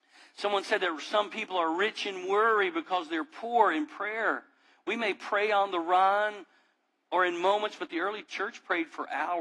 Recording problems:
thin; somewhat; fading below 250 Hz
garbled, watery; slightly
muffled; very slightly; fading above 1.5 kHz
abrupt cut into speech; at the end

